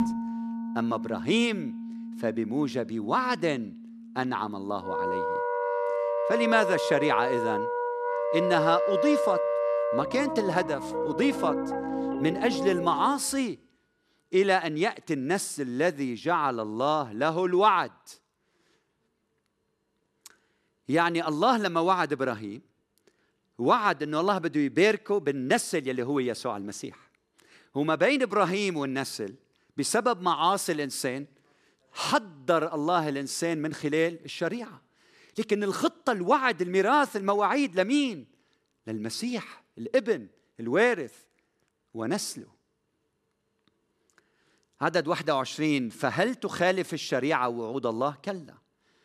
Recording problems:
background music; loud; until 13 s; 3 dB below the speech

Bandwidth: 14.5 kHz